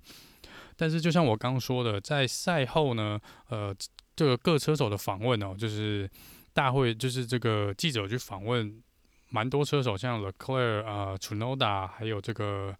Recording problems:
none

